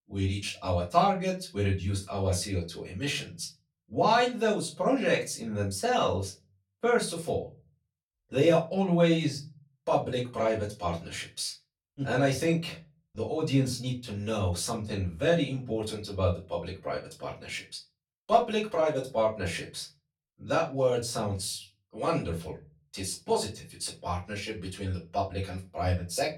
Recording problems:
off-mic speech; far
room echo; very slight; dies away in 0.3 s

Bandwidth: 17 kHz